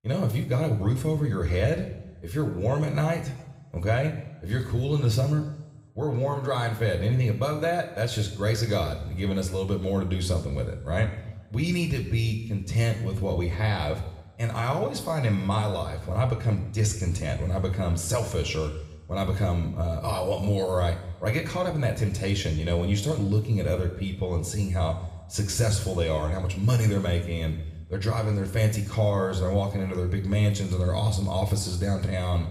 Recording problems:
room echo; slight; dies away in 0.9 s
off-mic speech; somewhat distant

